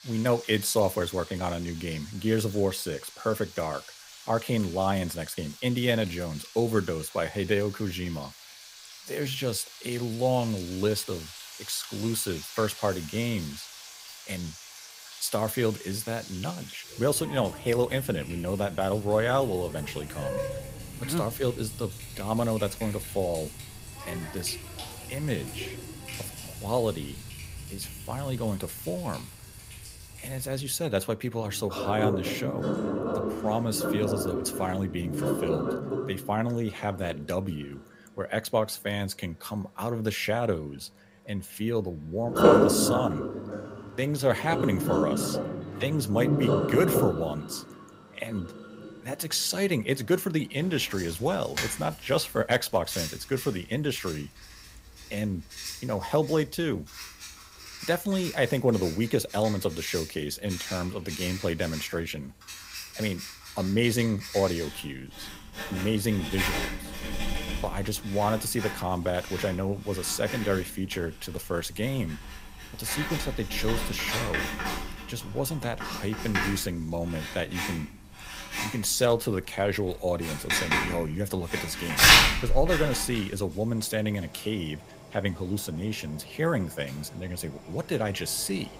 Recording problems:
household noises; loud; throughout; 1 dB below the speech

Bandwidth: 15.5 kHz